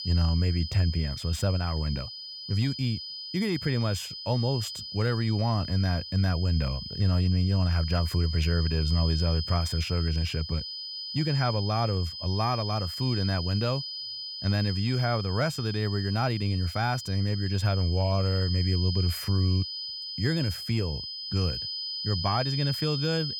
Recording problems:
high-pitched whine; loud; throughout; 5 kHz, 6 dB below the speech

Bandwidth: 18 kHz